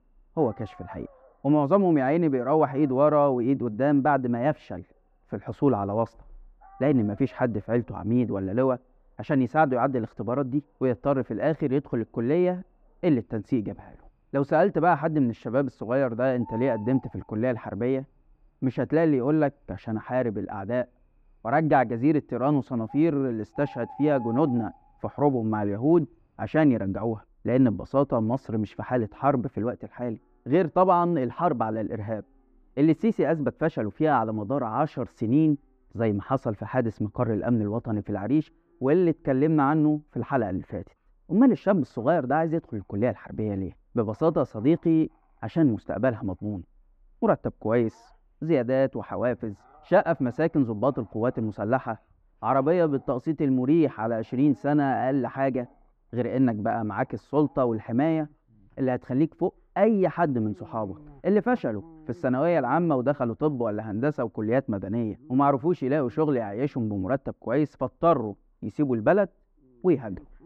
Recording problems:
muffled; very; fading above 3 kHz
animal sounds; faint; throughout; 25 dB below the speech

